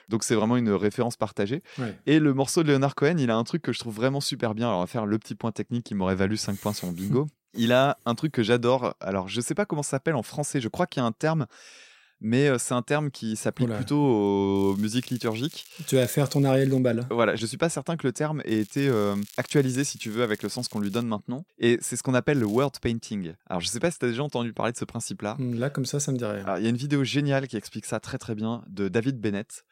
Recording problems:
crackling; faint; from 15 to 17 s, from 18 to 21 s and at 22 s; 20 dB below the speech

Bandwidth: 16 kHz